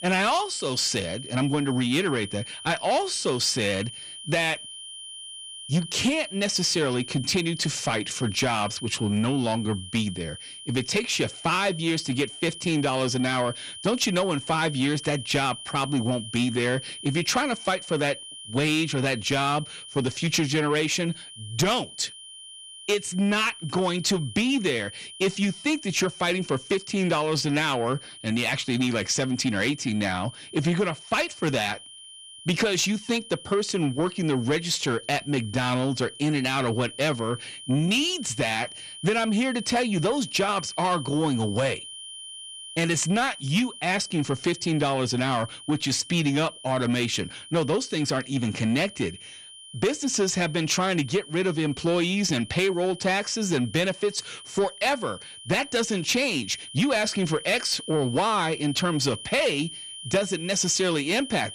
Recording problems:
distortion; slight; 10 dB below the speech
high-pitched whine; noticeable; throughout; 3 kHz, 15 dB below the speech

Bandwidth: 15 kHz